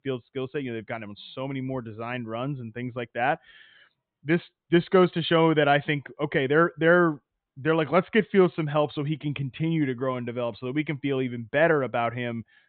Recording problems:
high frequencies cut off; severe; nothing above 4 kHz

